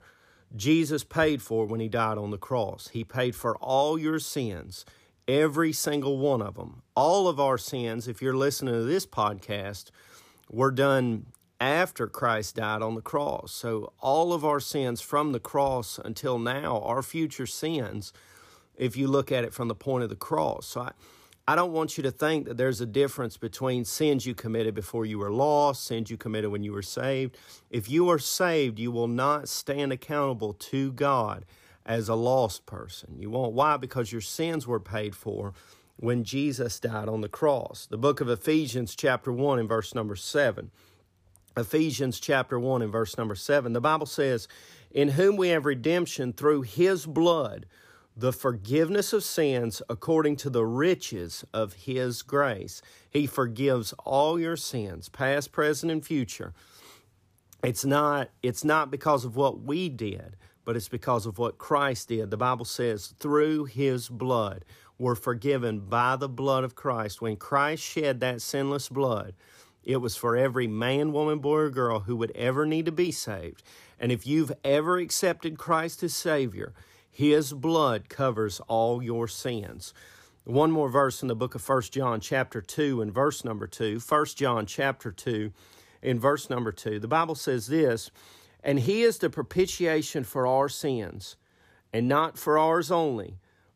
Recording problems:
none

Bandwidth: 15 kHz